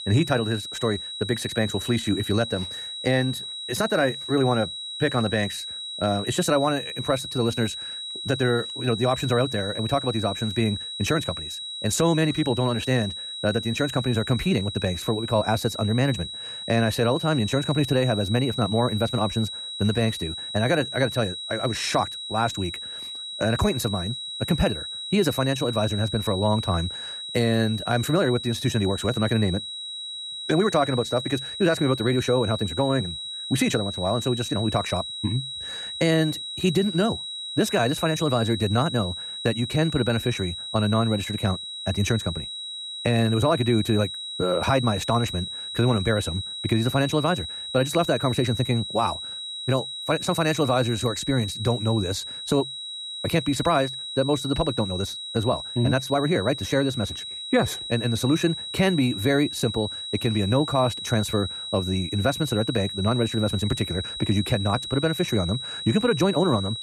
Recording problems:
wrong speed, natural pitch; too fast; 1.5 times normal speed
high-pitched whine; loud; throughout; 4 kHz, 7 dB below the speech

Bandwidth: 14.5 kHz